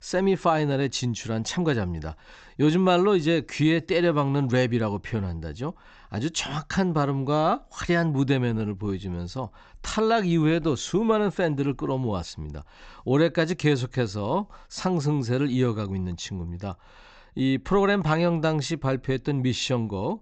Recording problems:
high frequencies cut off; noticeable; nothing above 8 kHz

